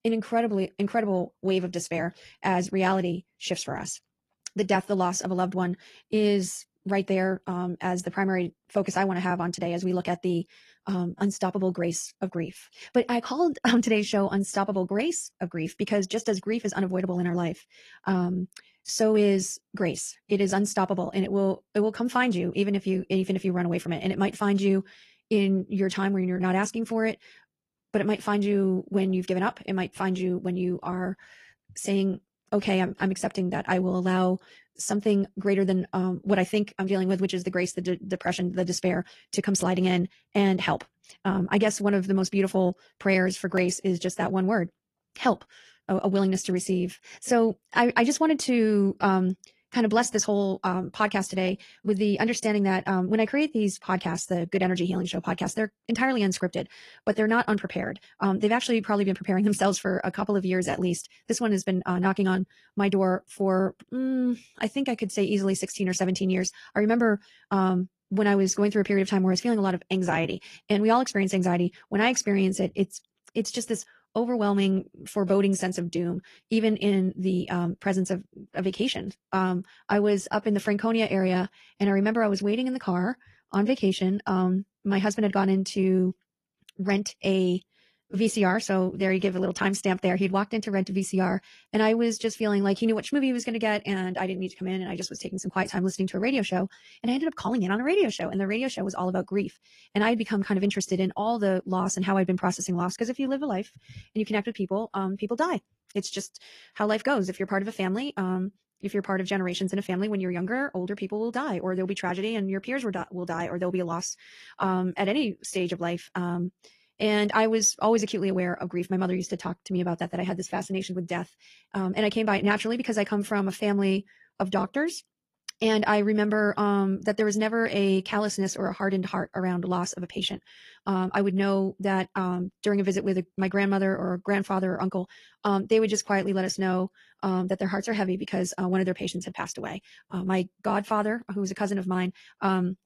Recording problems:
wrong speed, natural pitch; too fast; 1.5 times normal speed
garbled, watery; slightly

